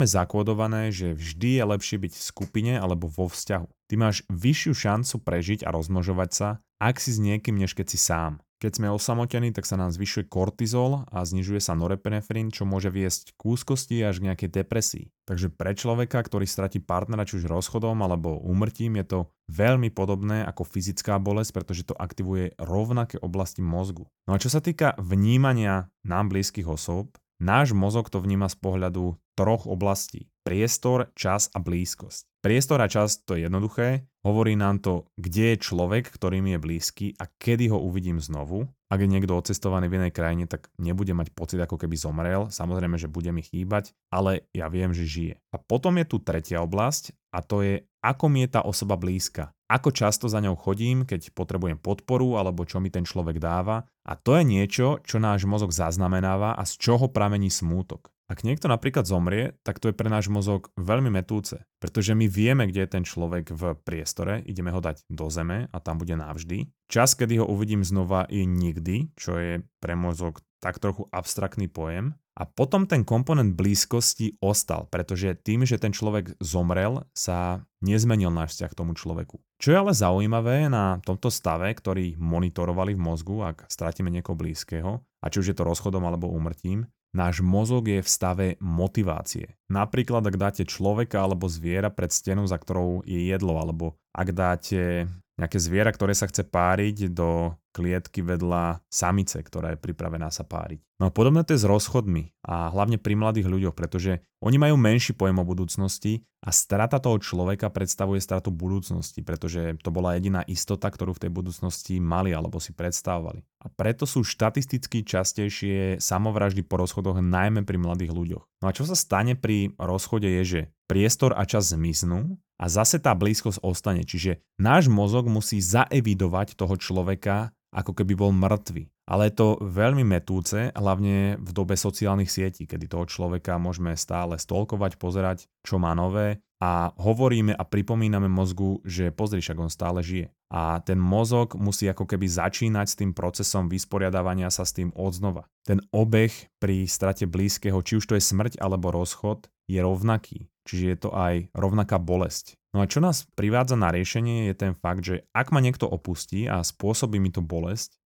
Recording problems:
abrupt cut into speech; at the start

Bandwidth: 18 kHz